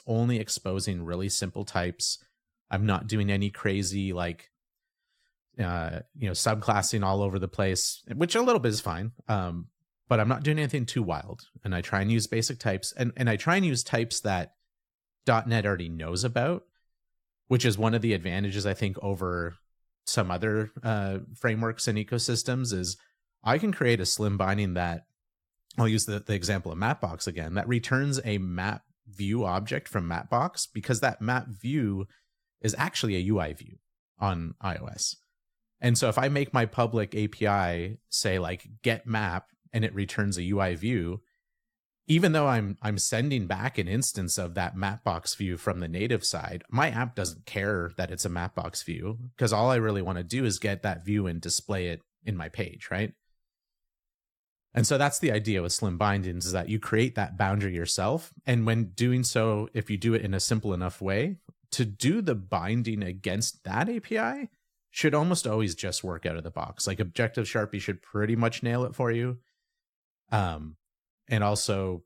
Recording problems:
none

